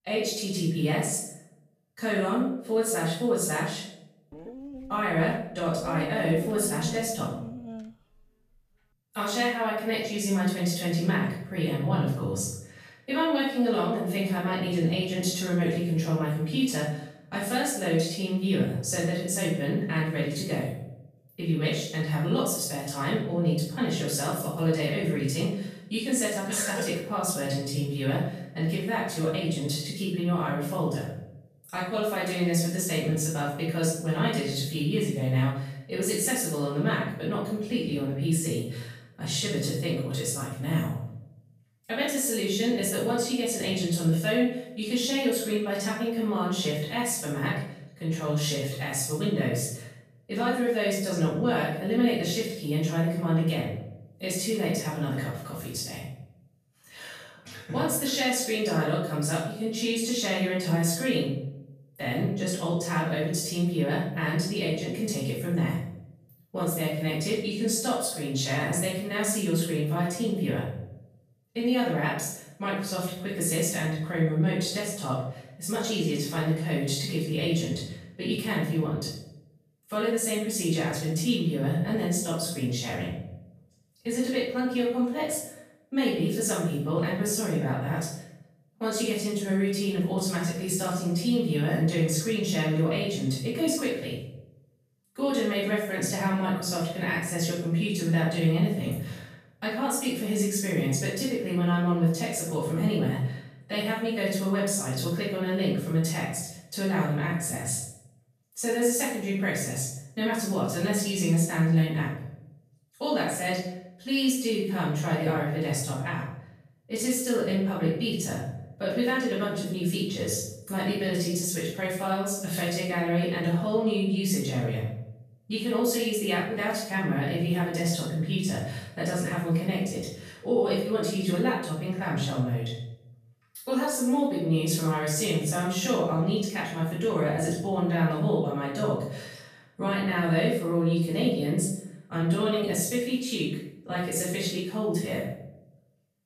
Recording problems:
off-mic speech; far
room echo; noticeable; dies away in 0.7 s
dog barking; noticeable; from 4.5 to 8 s; peak 8 dB below the speech

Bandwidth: 14.5 kHz